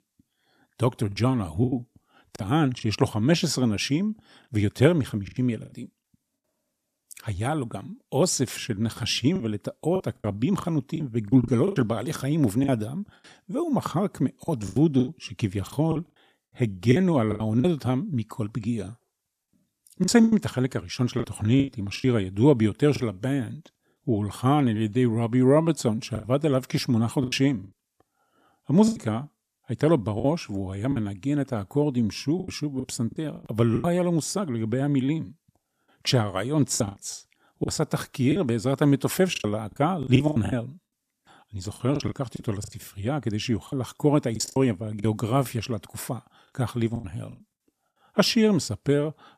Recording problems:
choppy; very; 9% of the speech affected

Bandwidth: 14.5 kHz